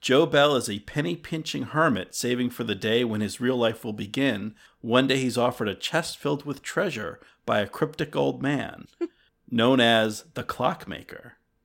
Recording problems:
none

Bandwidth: 16.5 kHz